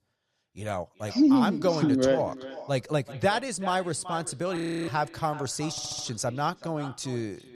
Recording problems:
echo of what is said; noticeable; throughout; 380 ms later, 15 dB below the speech
audio freezing; at 4.5 s
audio stuttering; at 5.5 s

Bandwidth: 15 kHz